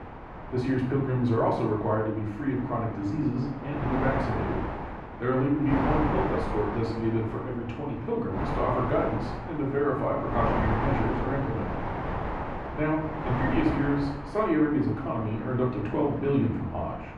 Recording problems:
off-mic speech; far
muffled; very; fading above 4 kHz
room echo; noticeable; dies away in 0.6 s
wind noise on the microphone; heavy; 4 dB below the speech

